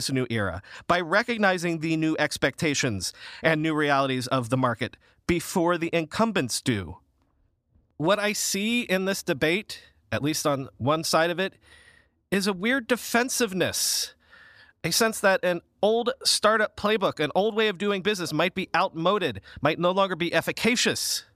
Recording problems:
abrupt cut into speech; at the start

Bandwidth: 14.5 kHz